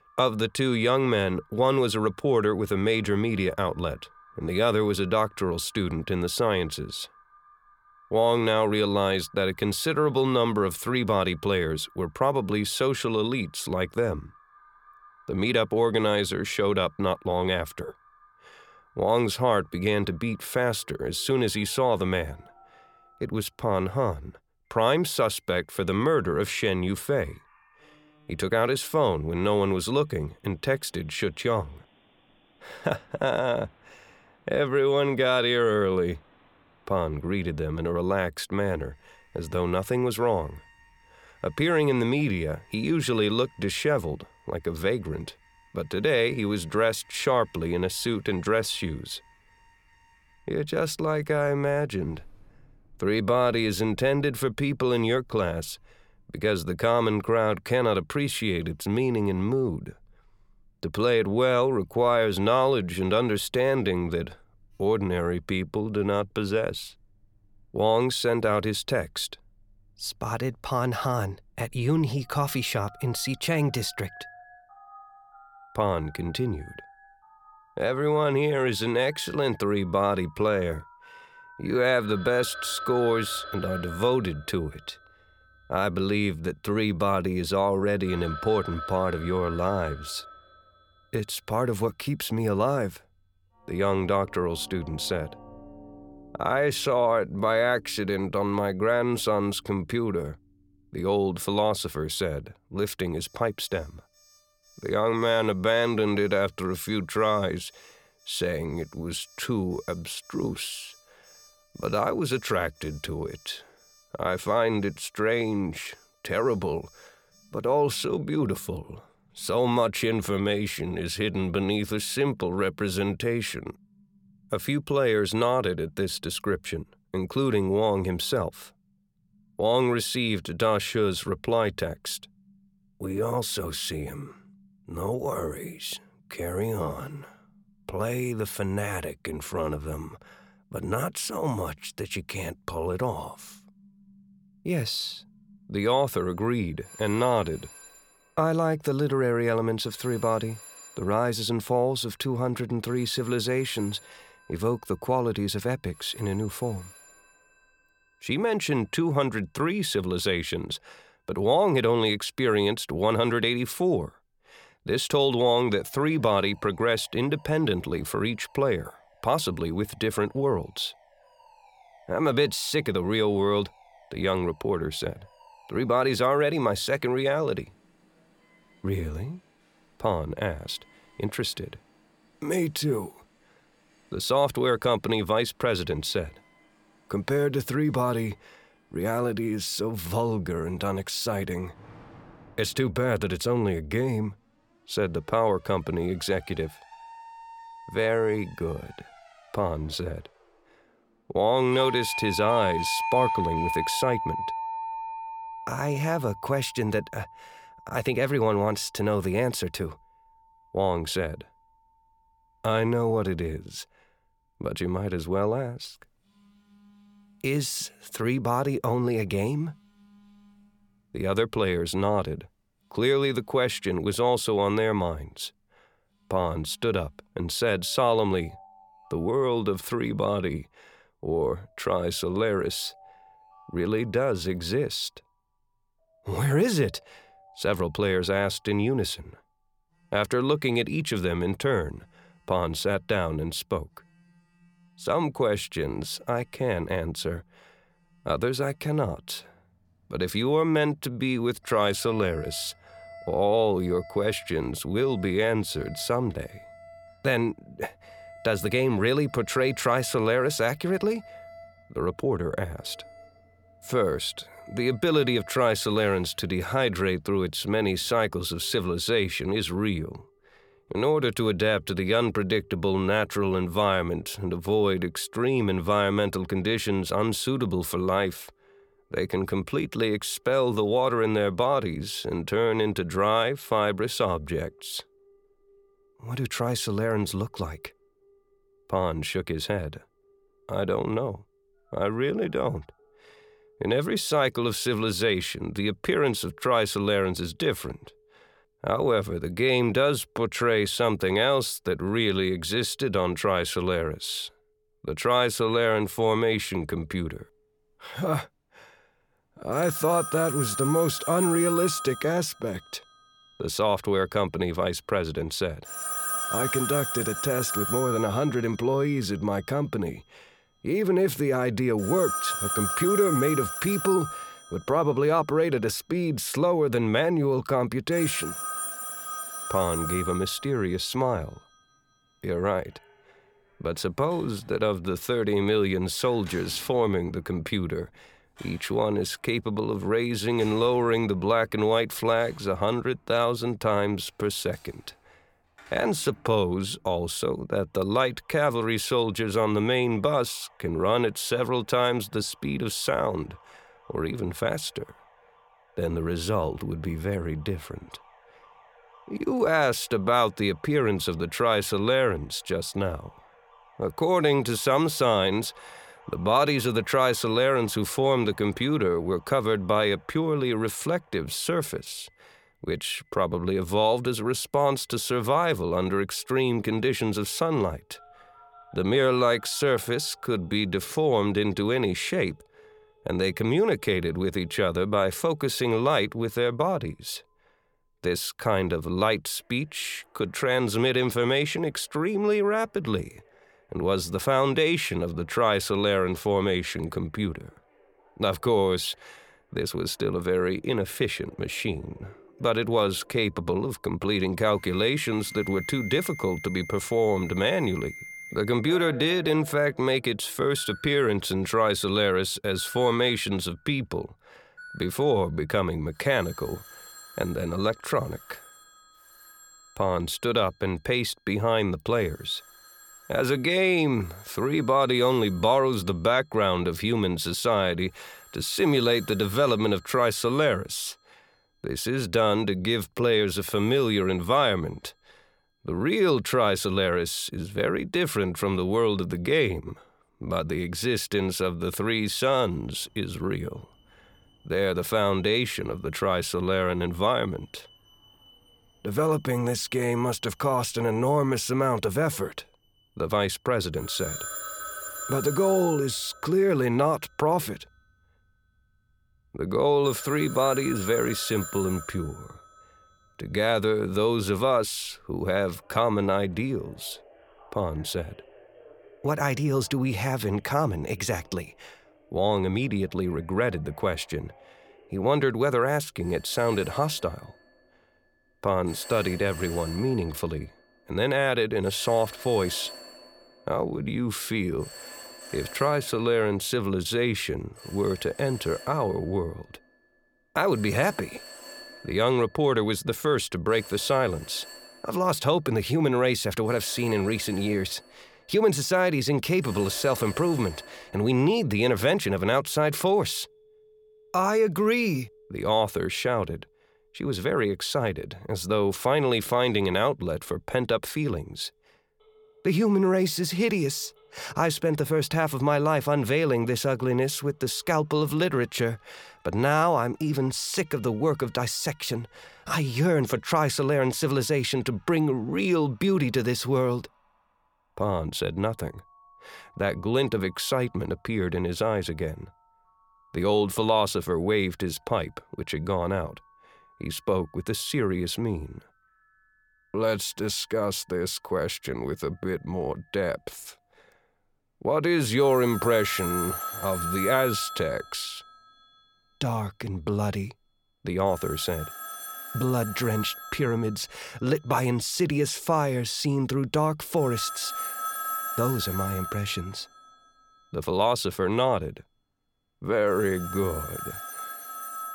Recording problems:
alarms or sirens; noticeable; throughout; 10 dB below the speech

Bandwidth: 17.5 kHz